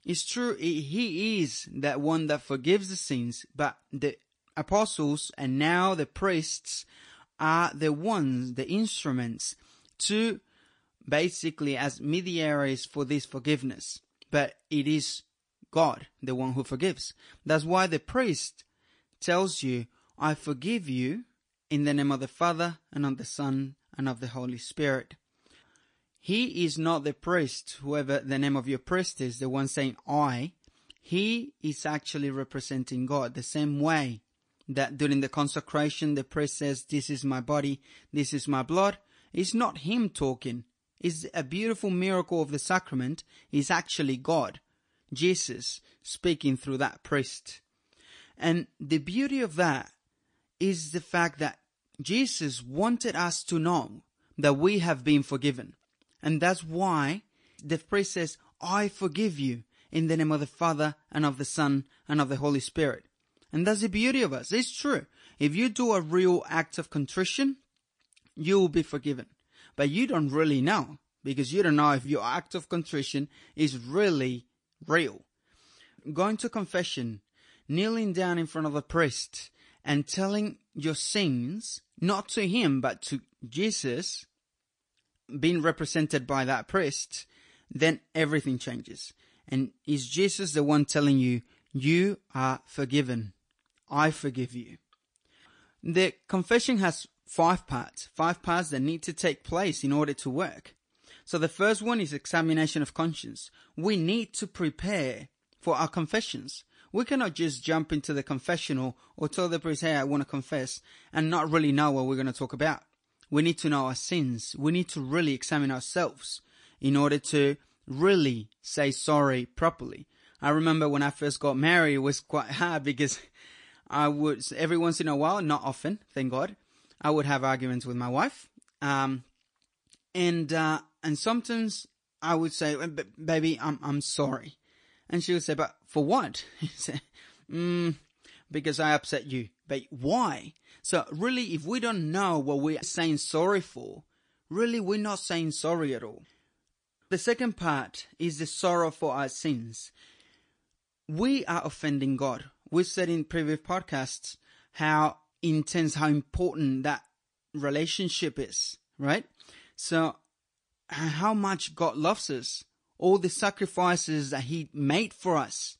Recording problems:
garbled, watery; slightly; nothing above 9 kHz

